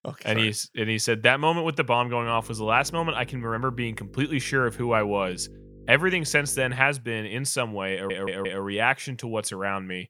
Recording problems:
electrical hum; faint; from 2 to 7 s; 50 Hz, 30 dB below the speech
audio stuttering; at 8 s

